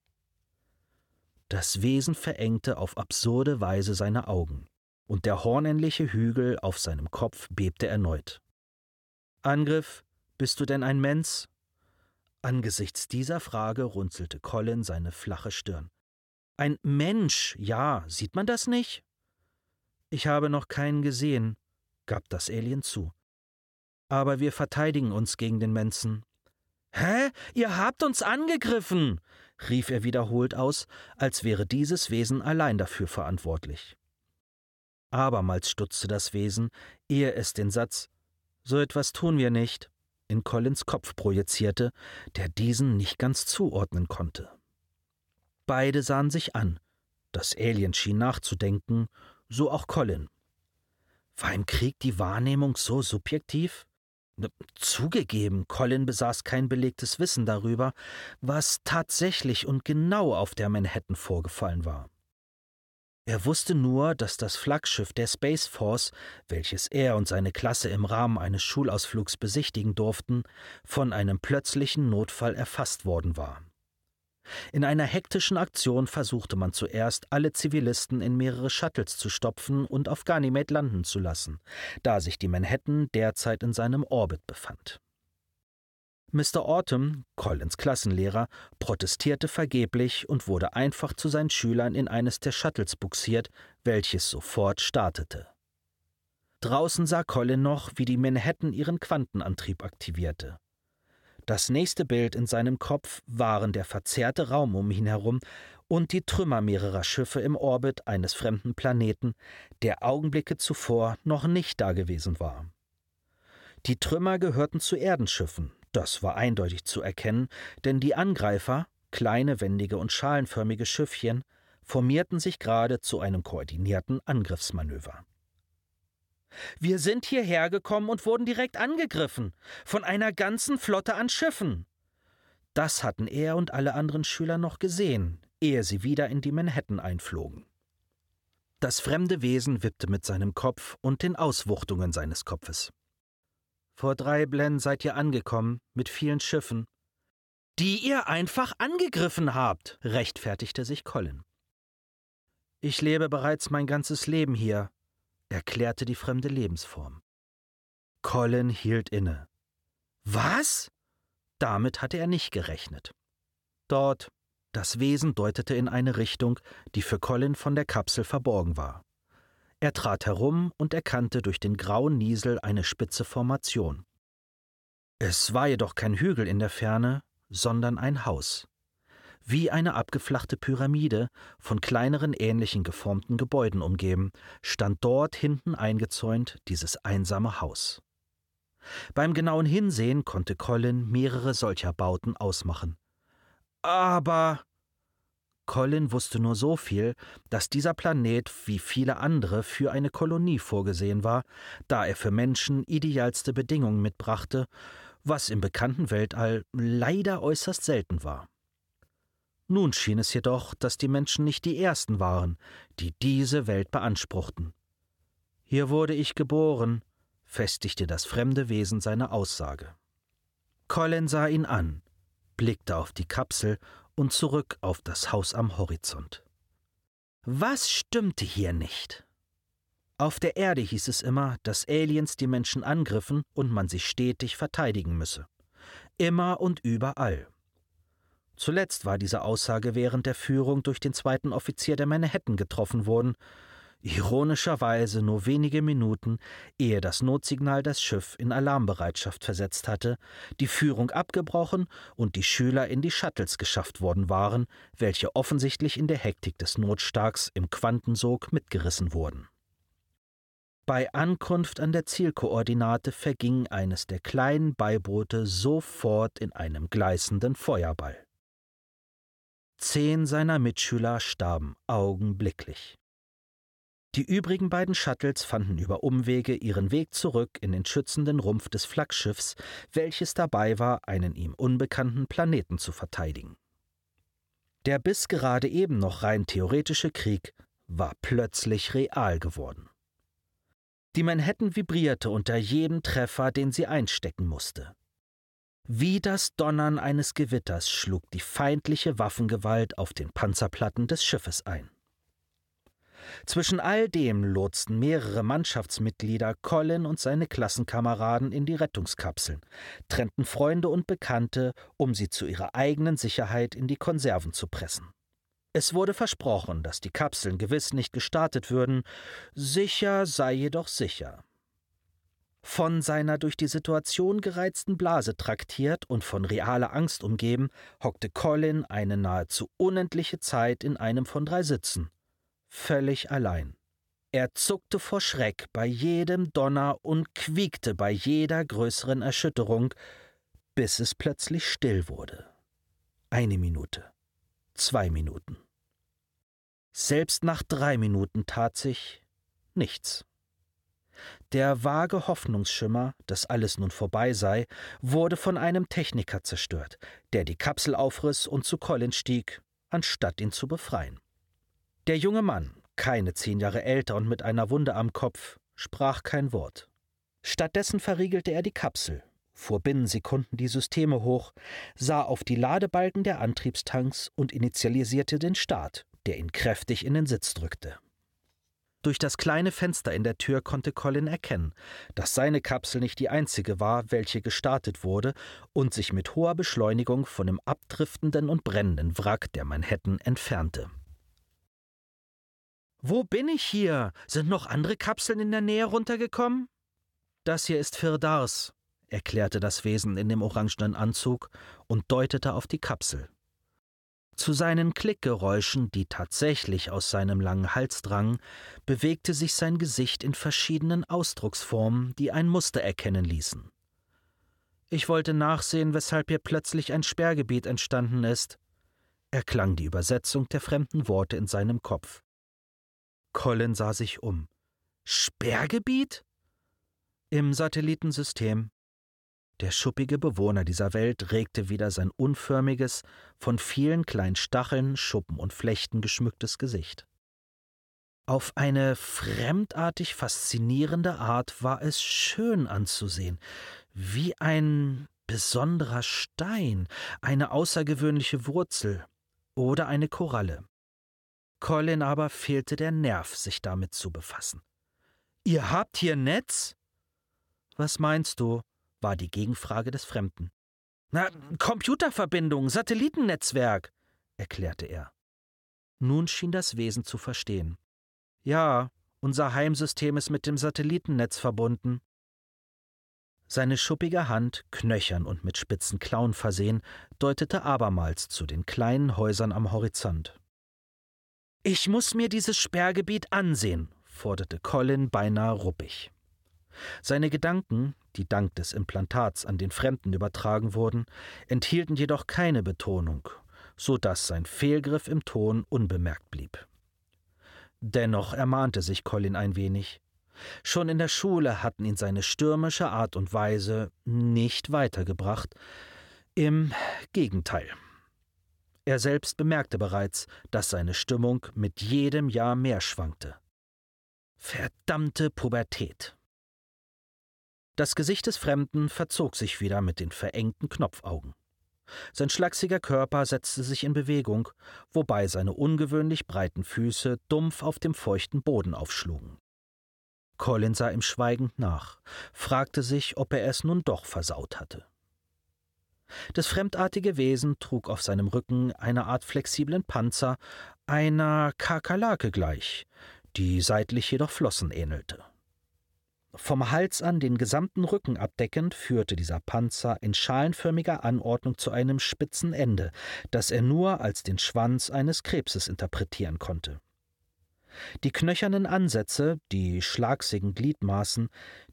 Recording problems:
none

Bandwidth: 17 kHz